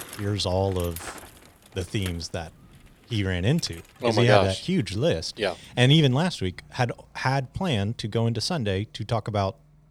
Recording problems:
traffic noise; faint; throughout; 20 dB below the speech

